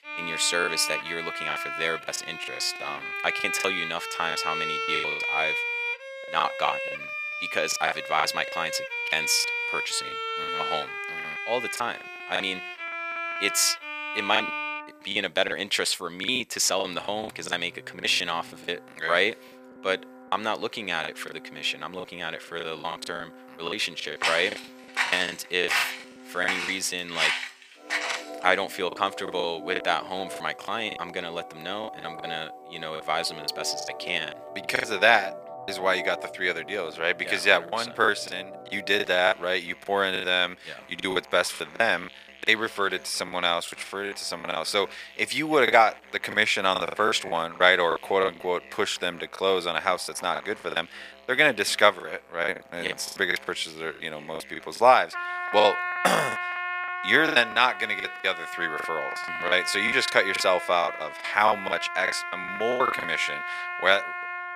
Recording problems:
thin; very; fading below 600 Hz
background music; loud; throughout; 6 dB below the speech
choppy; very; 13% of the speech affected
footsteps; loud; from 24 to 28 s; peak 1 dB above the speech

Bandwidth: 15 kHz